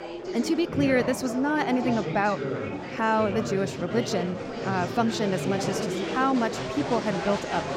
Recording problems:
chatter from many people; loud; throughout; 4 dB below the speech

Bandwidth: 16 kHz